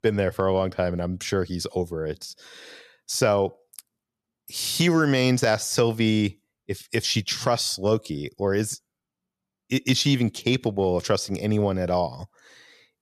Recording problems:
none

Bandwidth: 14 kHz